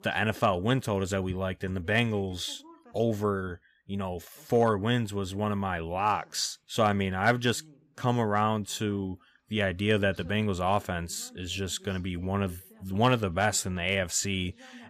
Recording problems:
voice in the background; faint; throughout; 30 dB below the speech

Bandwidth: 15 kHz